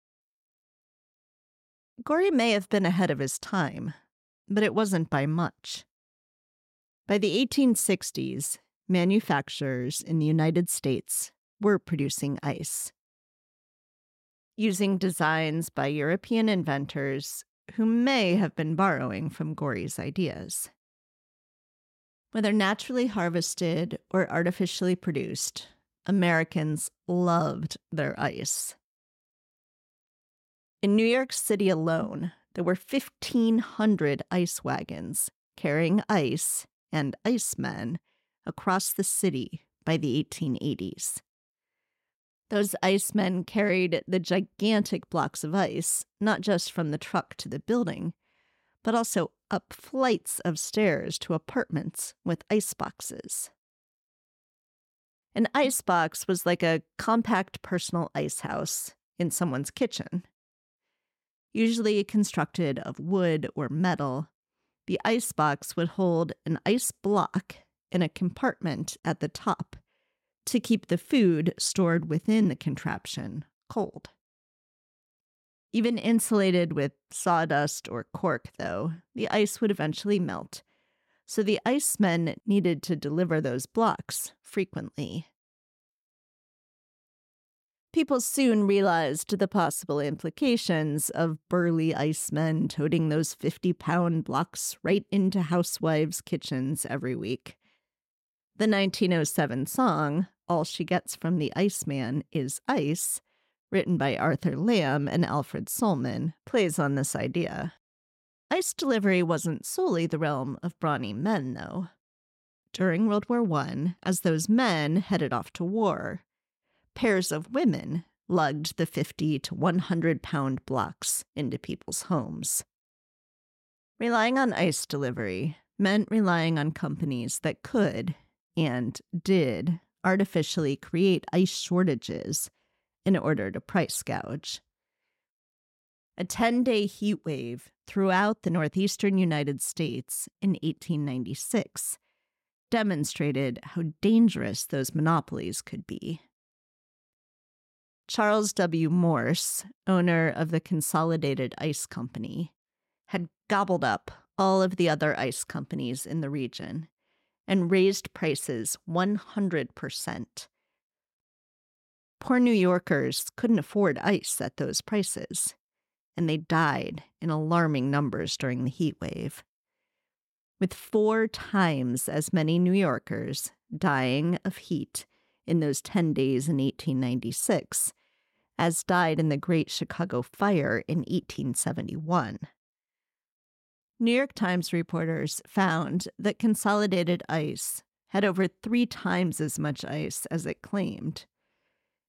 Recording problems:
none

